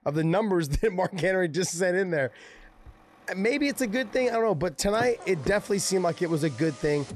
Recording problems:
traffic noise; noticeable; throughout; 20 dB below the speech

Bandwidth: 13.5 kHz